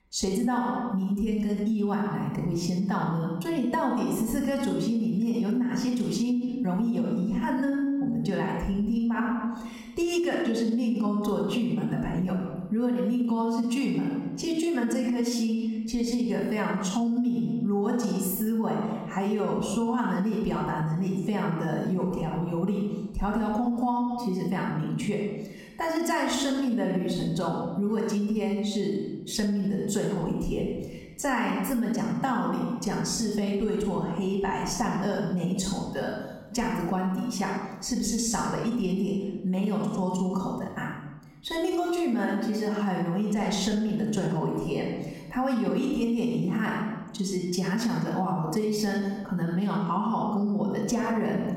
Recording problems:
off-mic speech; far
room echo; noticeable; dies away in 1 s
squashed, flat; somewhat

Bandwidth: 16.5 kHz